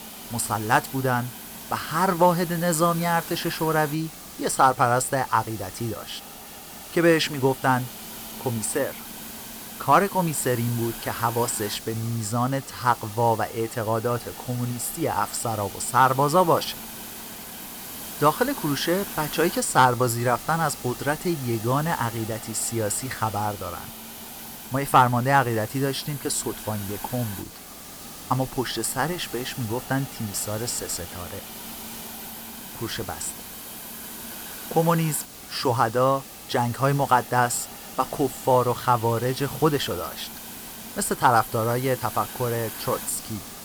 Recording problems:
hiss; noticeable; throughout; 10 dB below the speech

